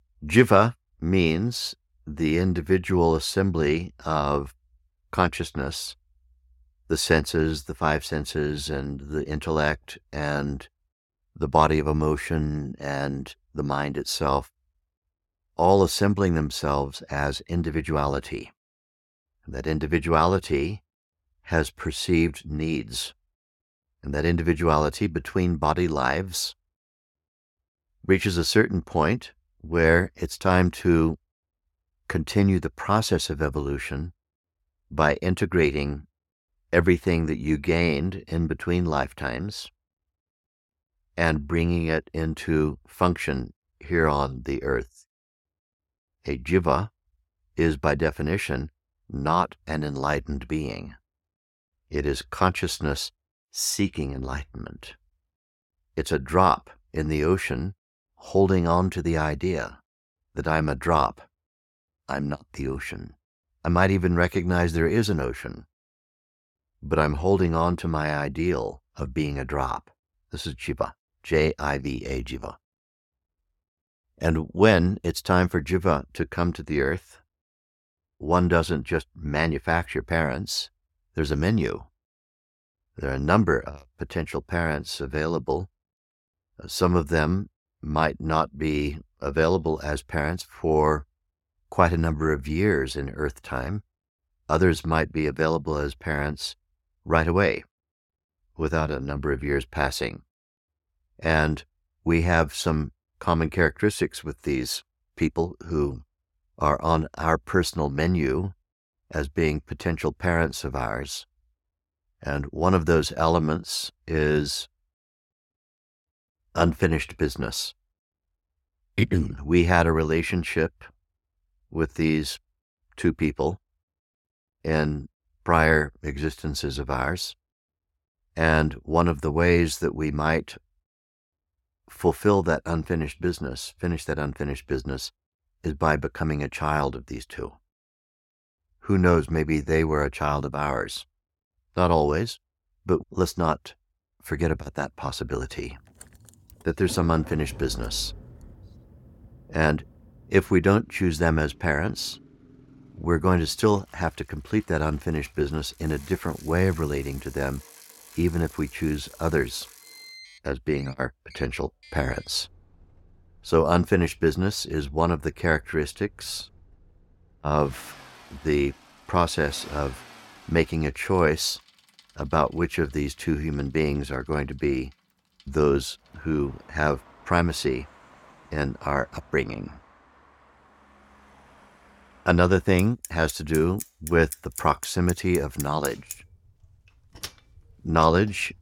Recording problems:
traffic noise; noticeable; from 2:25 on; 20 dB below the speech

